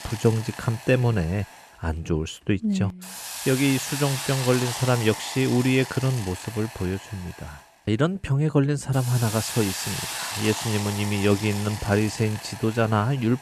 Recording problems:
hiss; loud; throughout; 8 dB below the speech

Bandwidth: 13.5 kHz